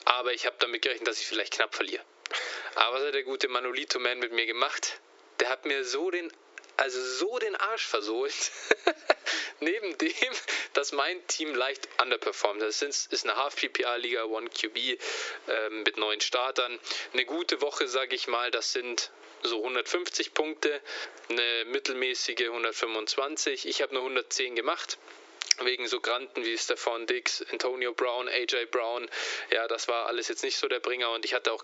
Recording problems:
thin; very; fading below 300 Hz
squashed, flat; heavily
high frequencies cut off; noticeable; nothing above 8 kHz

